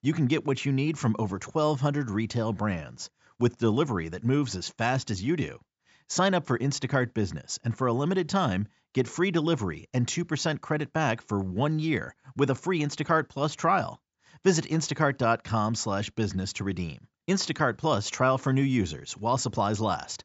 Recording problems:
high frequencies cut off; noticeable; nothing above 8 kHz

